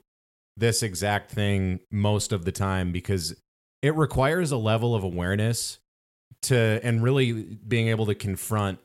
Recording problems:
none

